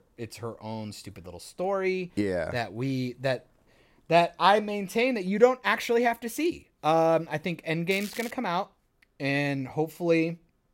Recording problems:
crackling; noticeable; at 8 s; 15 dB below the speech

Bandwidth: 16 kHz